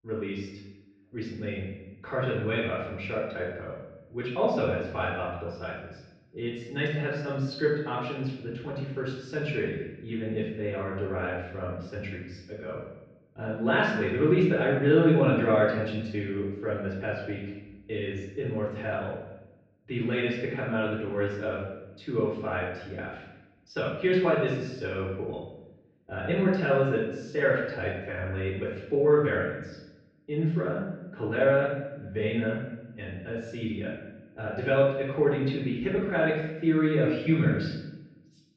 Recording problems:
off-mic speech; far
room echo; noticeable; dies away in 0.8 s
muffled; slightly; fading above 3.5 kHz

